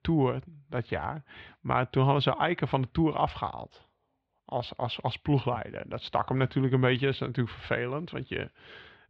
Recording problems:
muffled; slightly; fading above 3.5 kHz

